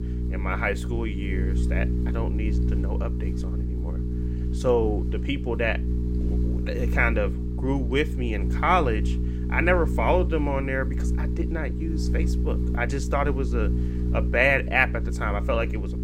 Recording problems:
electrical hum; noticeable; throughout; 60 Hz, 10 dB below the speech

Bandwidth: 16 kHz